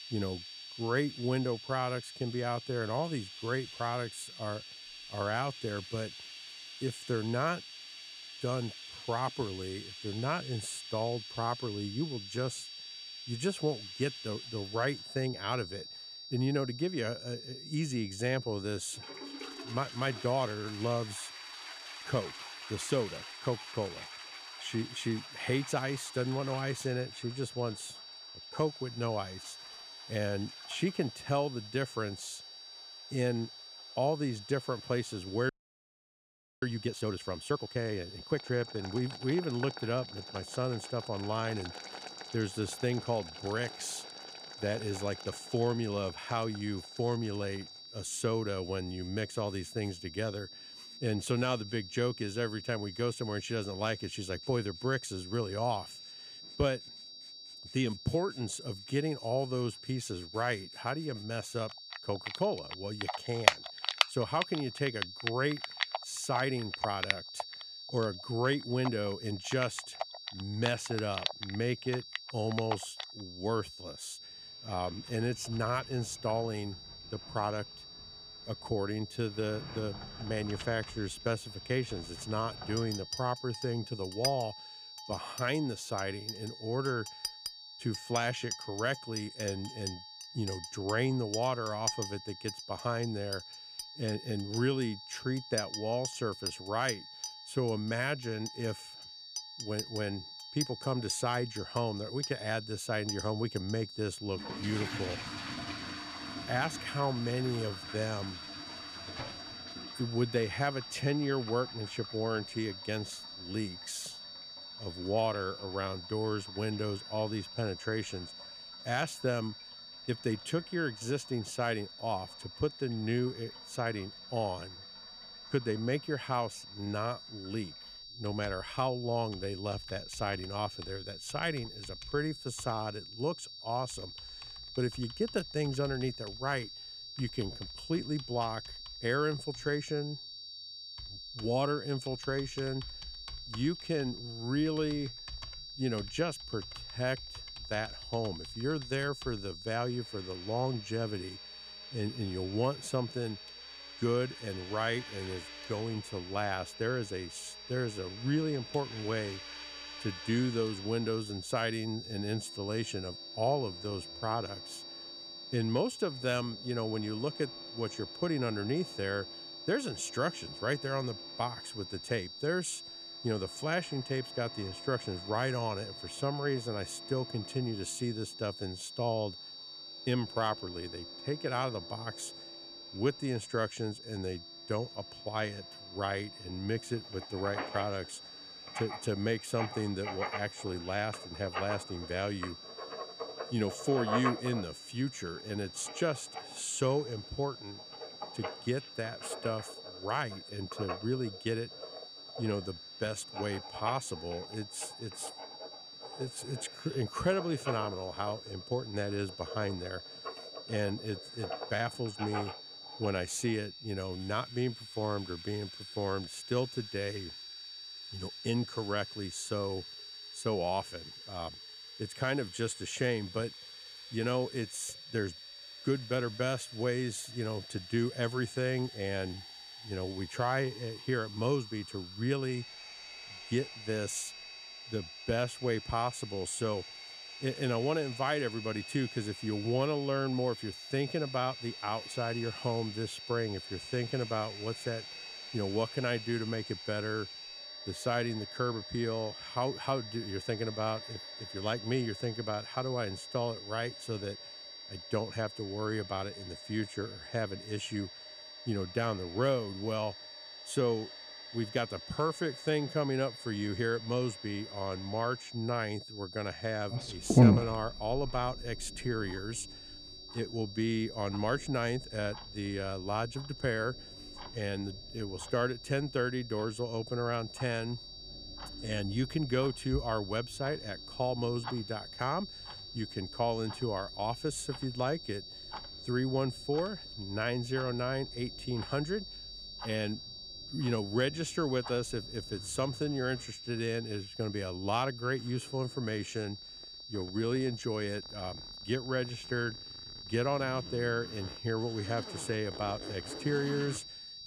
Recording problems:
high-pitched whine; loud; throughout; 4.5 kHz, 10 dB below the speech
household noises; loud; throughout; 8 dB below the speech
audio freezing; at 35 s for 1 s

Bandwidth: 14.5 kHz